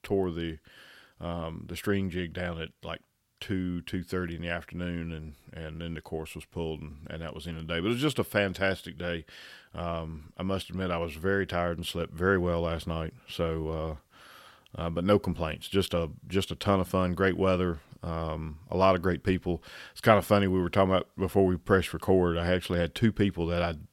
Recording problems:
none

